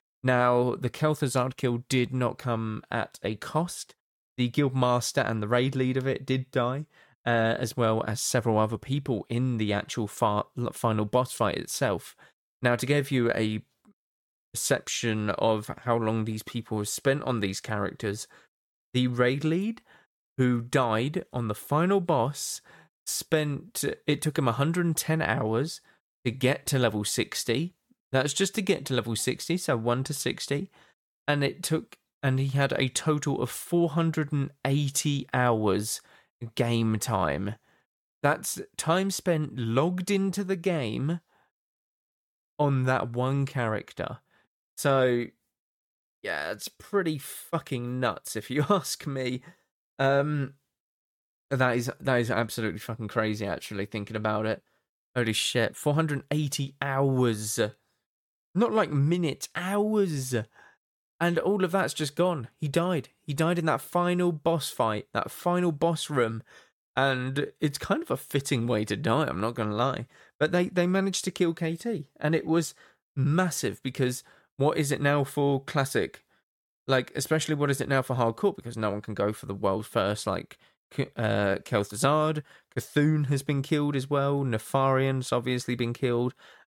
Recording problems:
none

